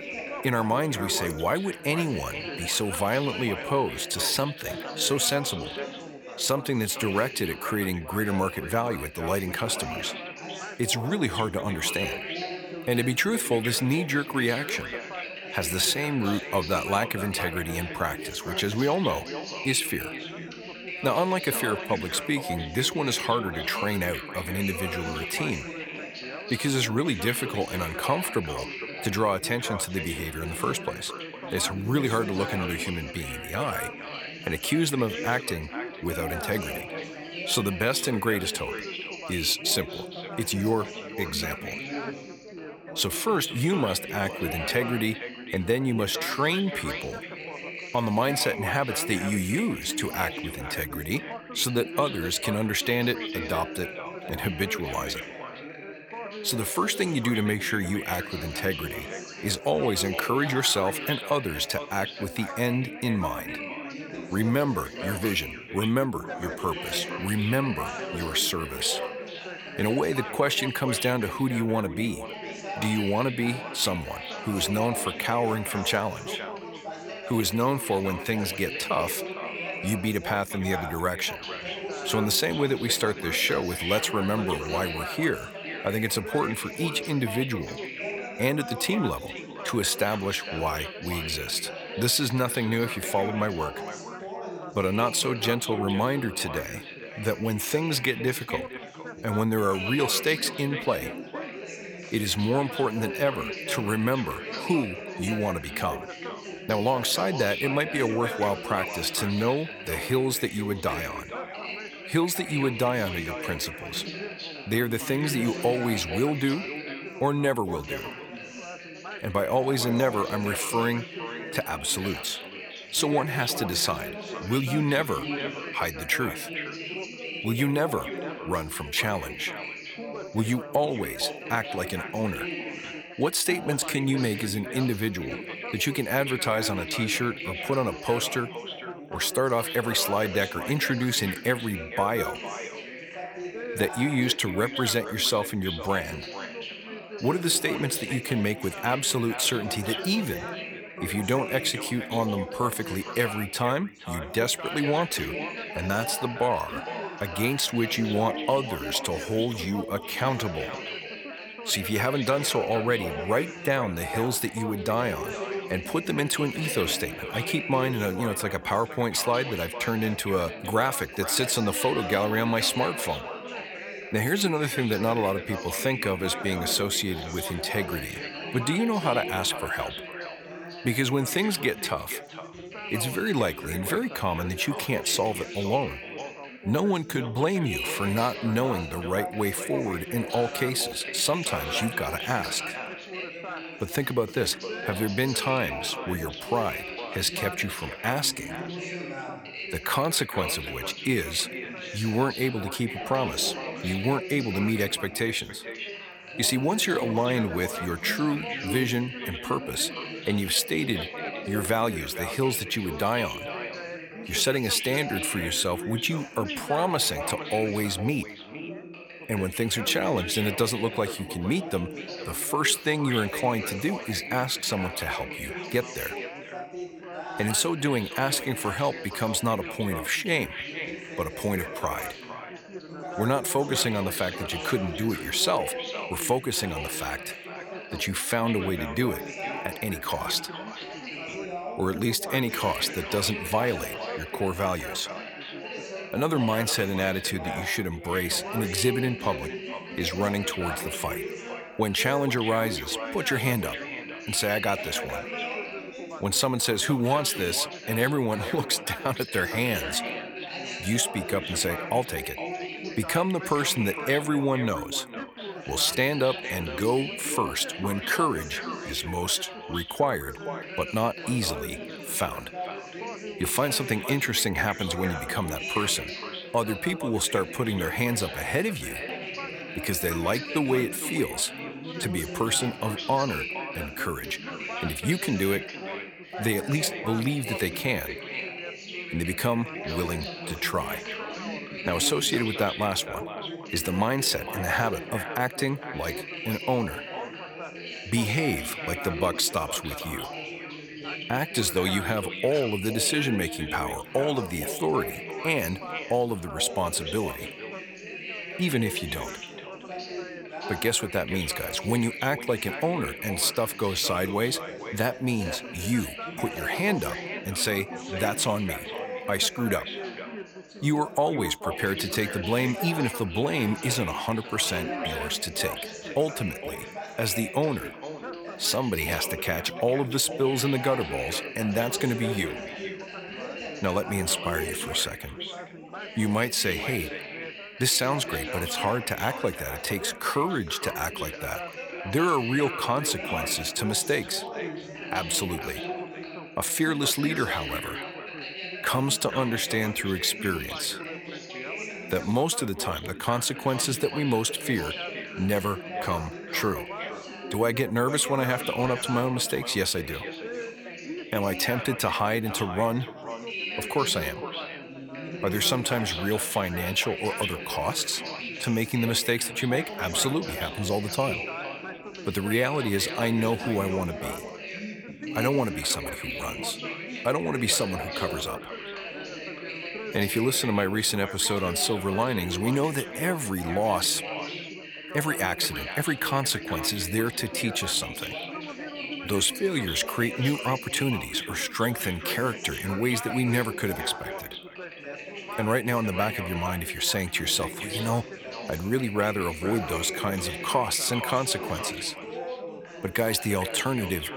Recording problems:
echo of what is said; noticeable; throughout; 460 ms later, 15 dB below the speech
background chatter; loud; throughout; 4 voices, 9 dB below the speech

